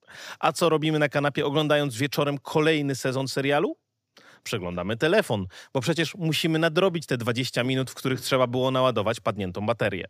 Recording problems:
none

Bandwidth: 15 kHz